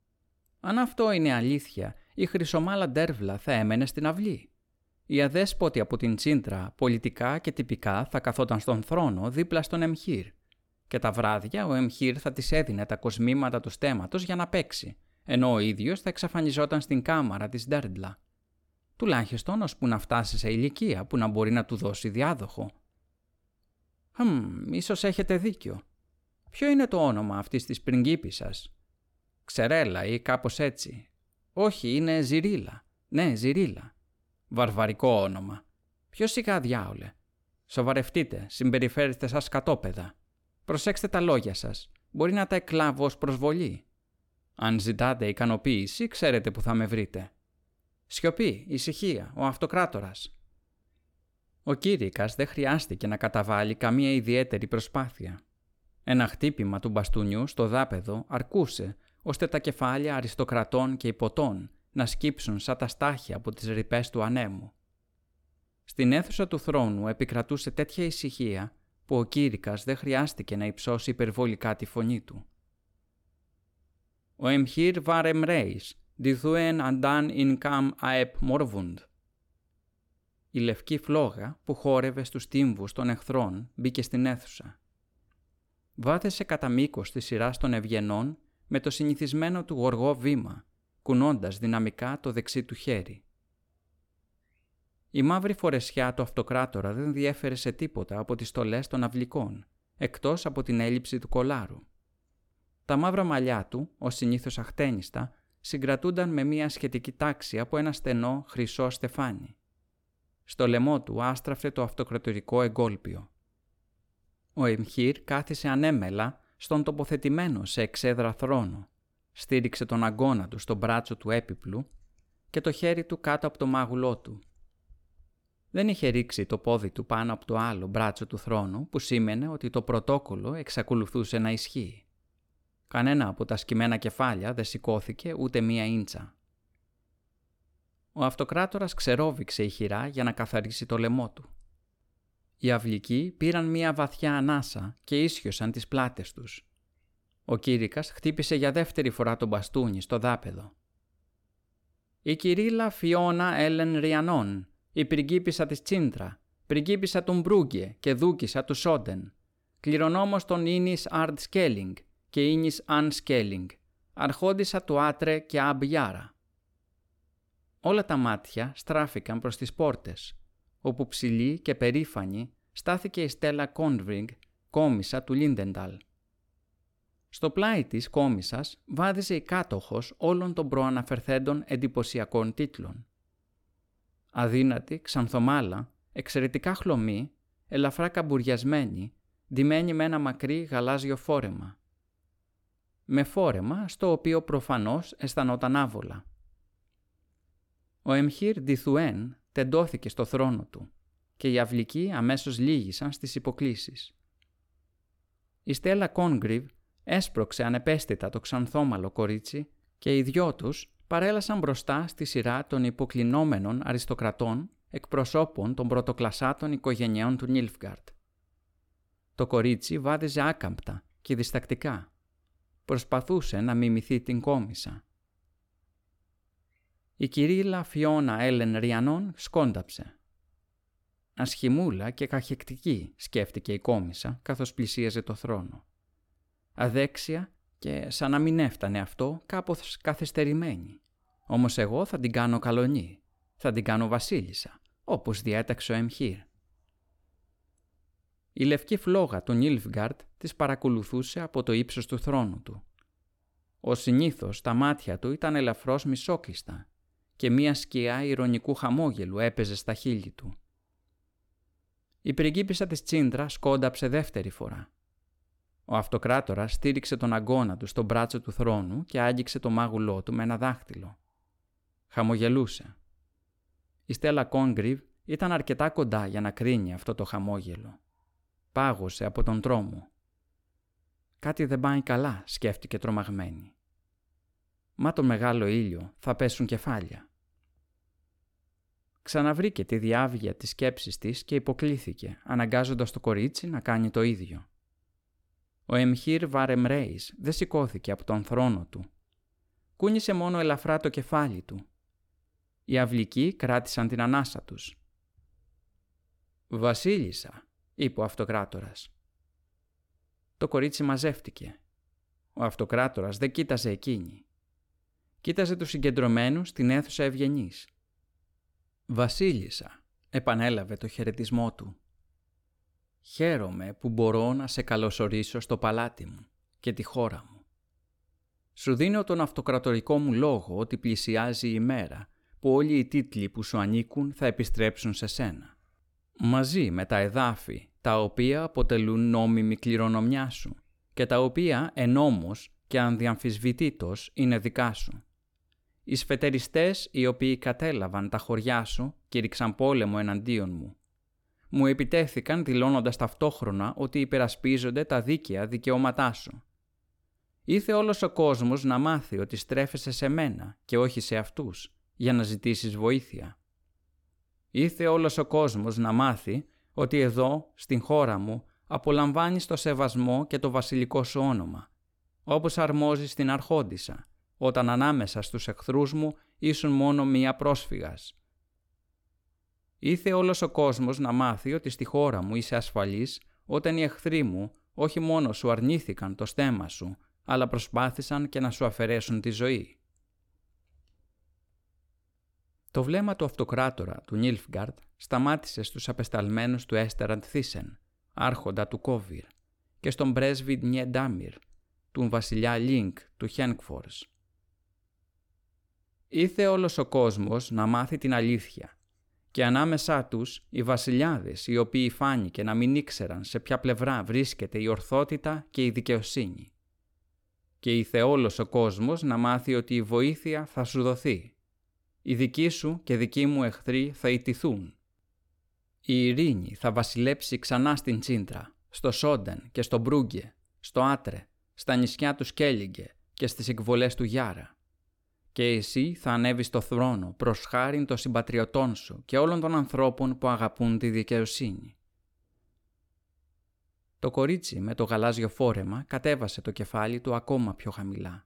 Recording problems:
none

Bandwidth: 17 kHz